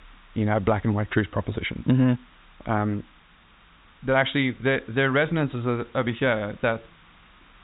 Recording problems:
high frequencies cut off; severe; nothing above 4 kHz
hiss; faint; throughout; 30 dB below the speech

